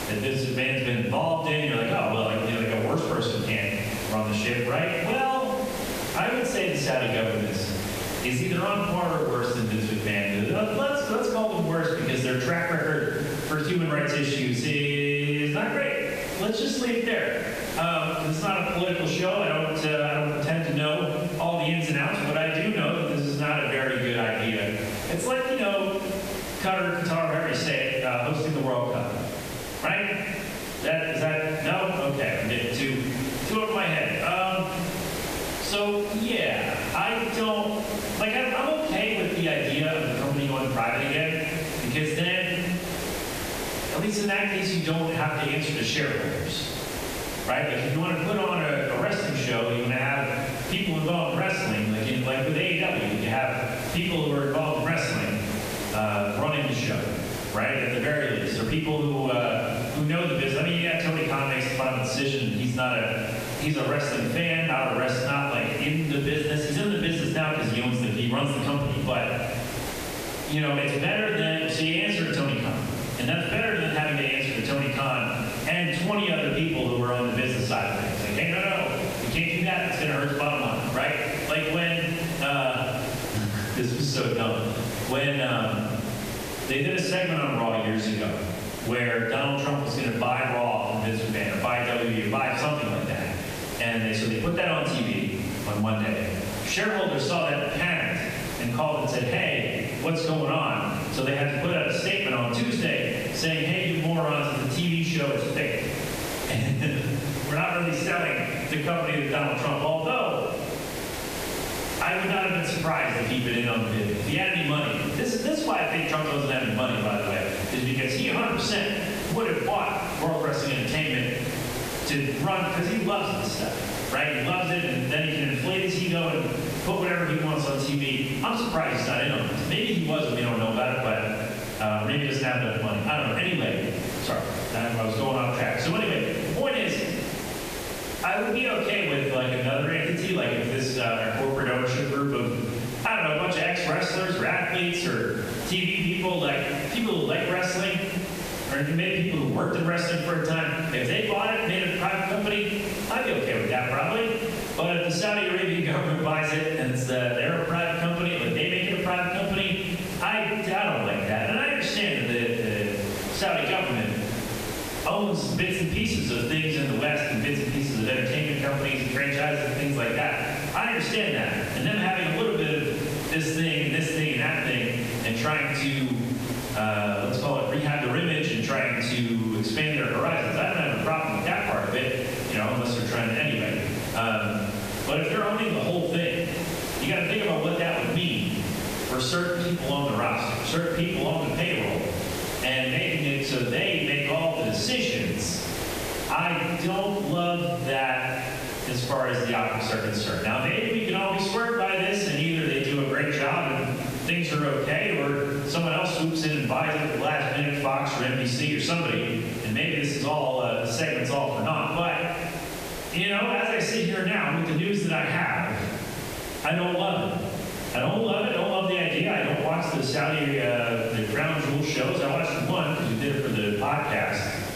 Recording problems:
off-mic speech; far
room echo; noticeable; dies away in 0.9 s
squashed, flat; somewhat
hiss; noticeable; throughout; 10 dB below the speech

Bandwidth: 14.5 kHz